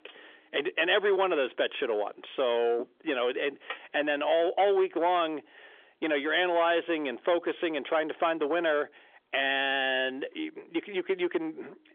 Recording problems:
phone-call audio; nothing above 3.5 kHz
distortion; slight; 10 dB below the speech

